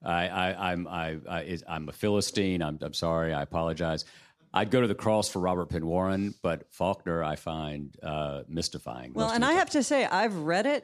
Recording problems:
none

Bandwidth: 14.5 kHz